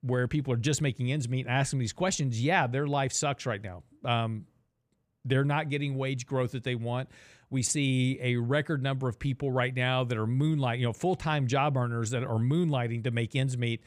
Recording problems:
none

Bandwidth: 15 kHz